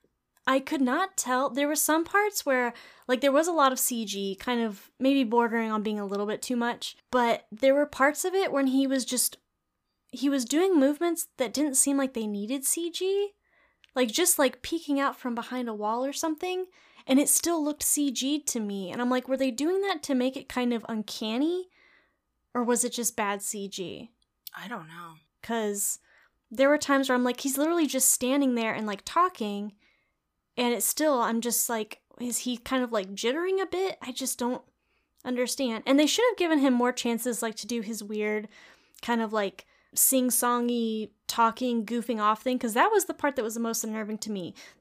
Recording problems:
none

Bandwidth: 15 kHz